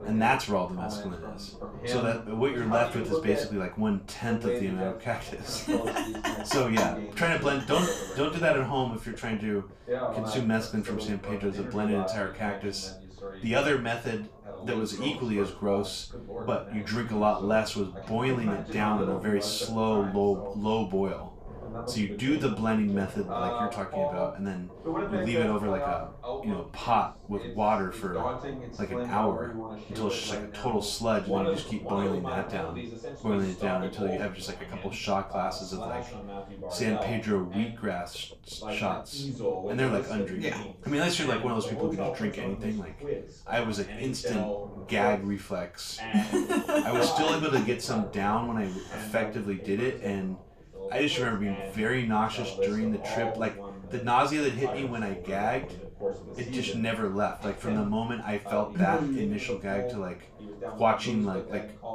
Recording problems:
off-mic speech; far
room echo; slight; dies away in 0.3 s
voice in the background; loud; throughout; 6 dB below the speech
low rumble; faint; throughout; 20 dB below the speech

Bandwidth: 14.5 kHz